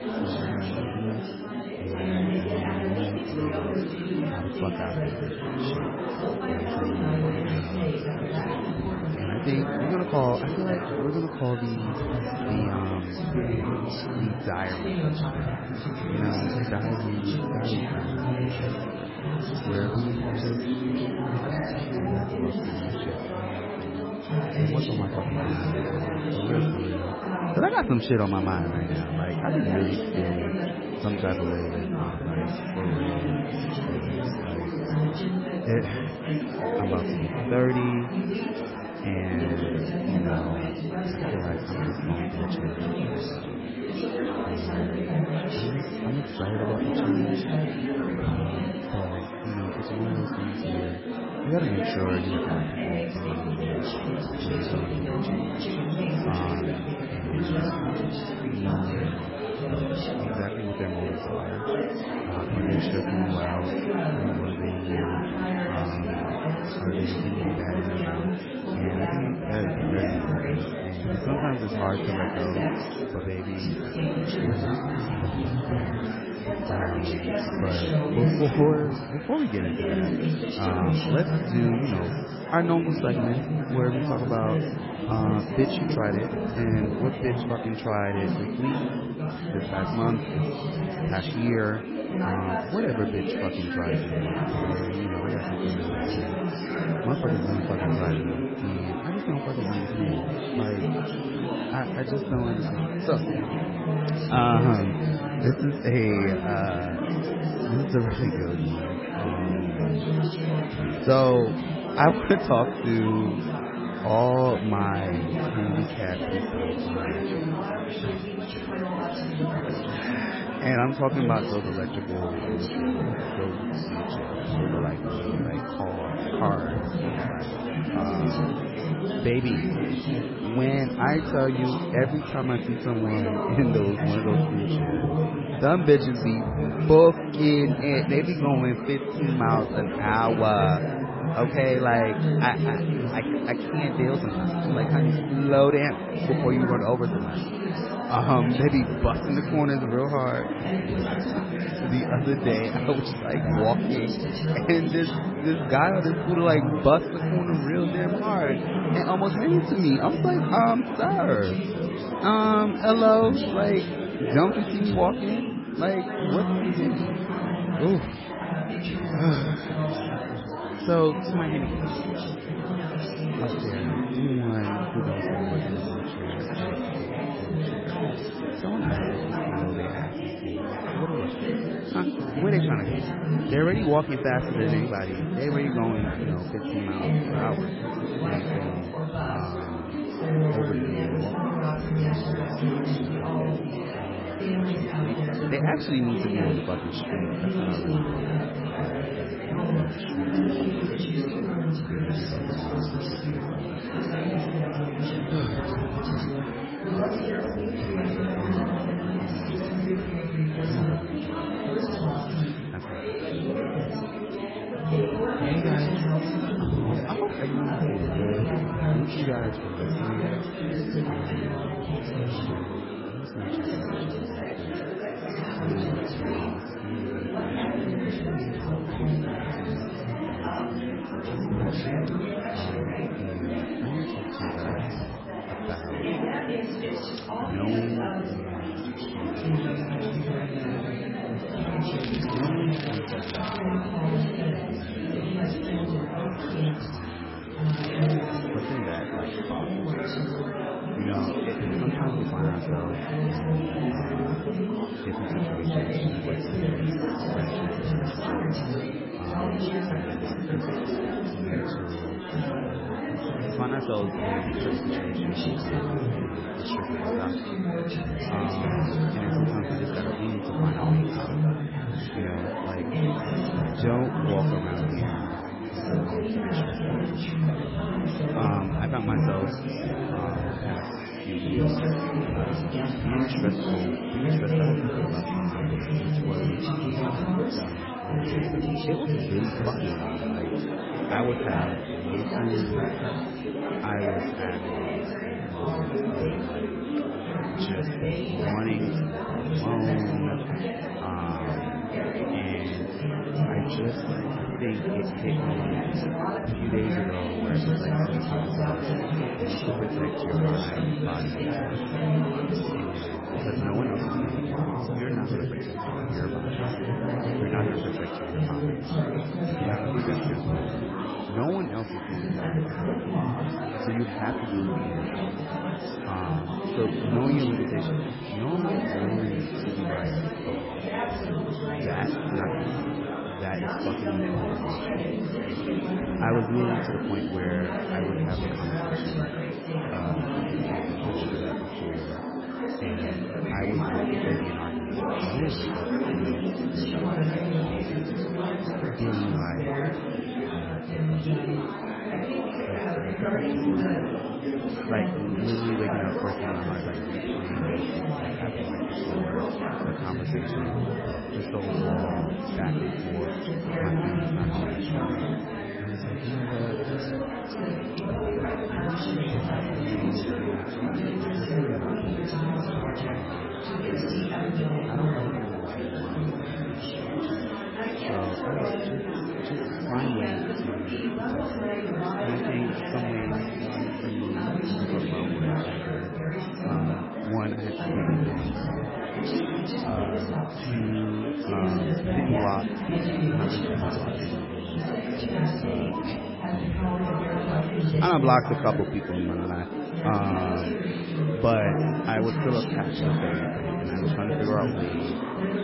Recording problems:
garbled, watery; badly; nothing above 5.5 kHz
chatter from many people; very loud; throughout; 1 dB above the speech
crackling; loud; from 4:02 to 4:04 and at 4:08; 9 dB below the speech

